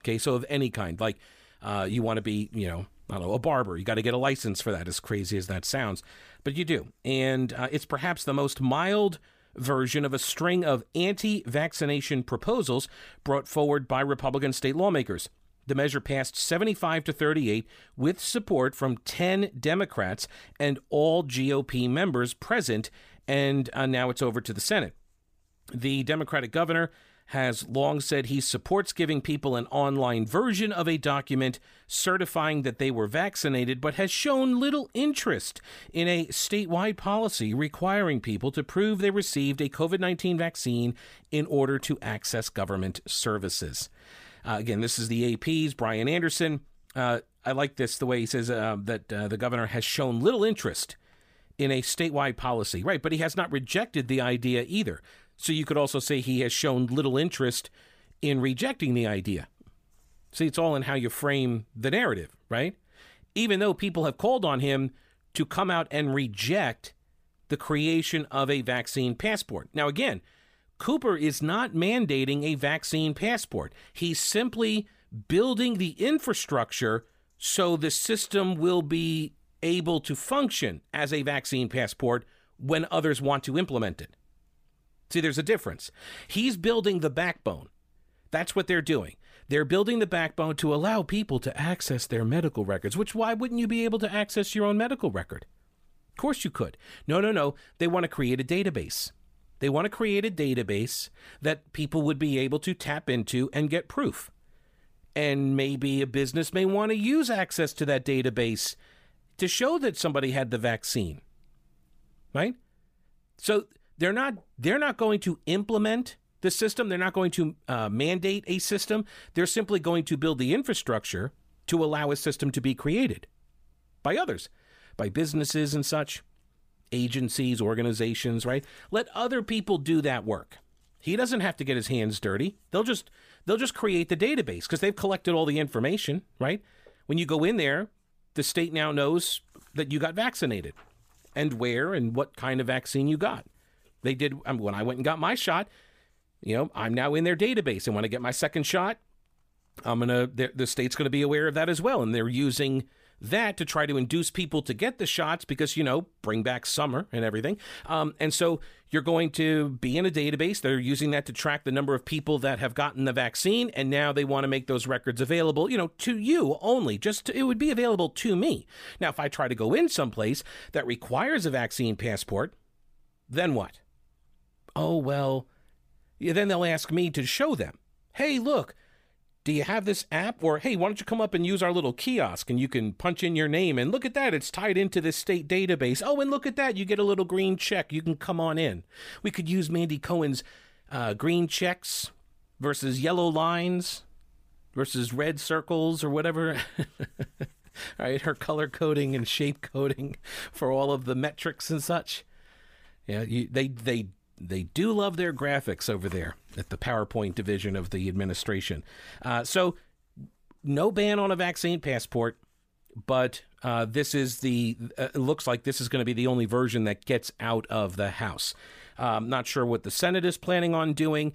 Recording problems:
none

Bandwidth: 15 kHz